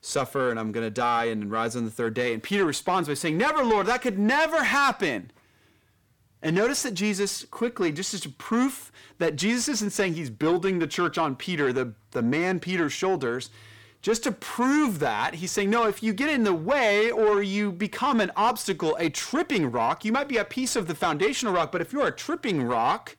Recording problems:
distortion; slight; 10 dB below the speech

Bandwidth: 18 kHz